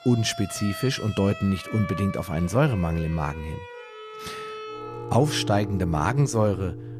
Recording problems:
background music; noticeable; throughout; 10 dB below the speech

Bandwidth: 14.5 kHz